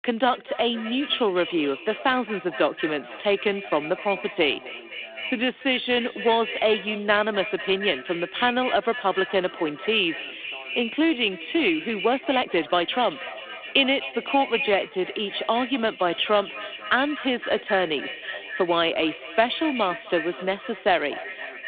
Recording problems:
echo of what is said; strong; throughout; 250 ms later, 10 dB below the speech
phone-call audio
voice in the background; faint; throughout; 25 dB below the speech
uneven, jittery; strongly; from 2 to 15 s

